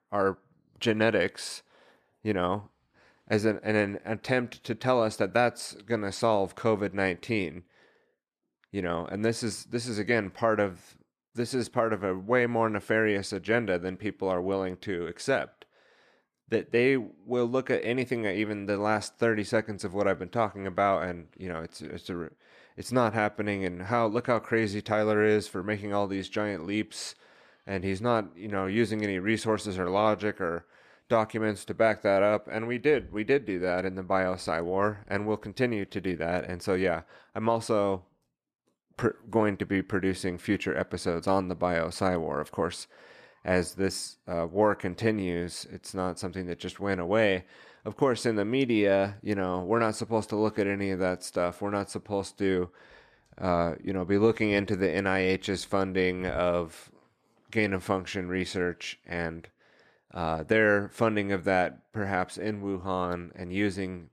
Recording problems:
none

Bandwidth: 14 kHz